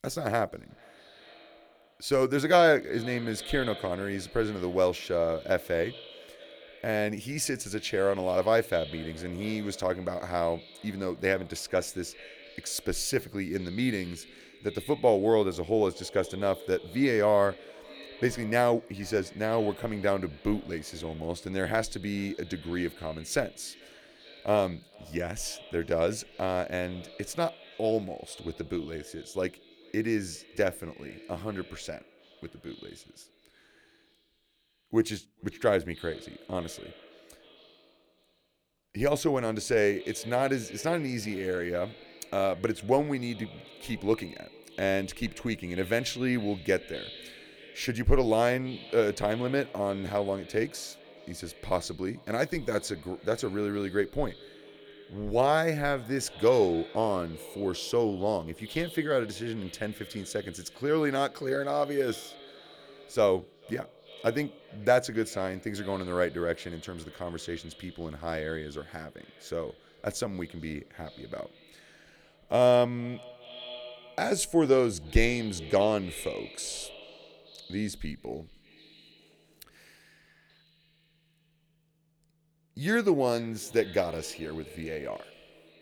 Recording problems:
echo of what is said; faint; throughout; 440 ms later, 20 dB below the speech

